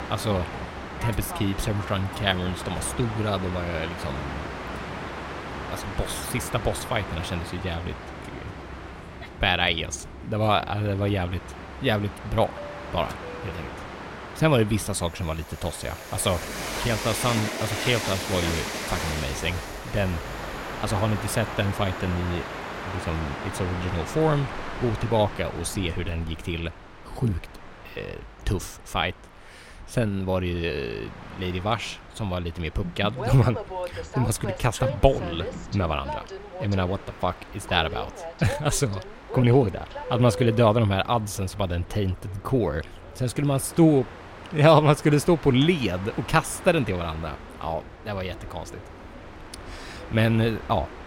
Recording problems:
train or aircraft noise; loud; throughout; 10 dB below the speech

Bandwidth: 16 kHz